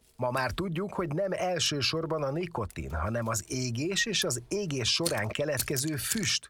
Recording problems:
household noises; loud; throughout; 7 dB below the speech

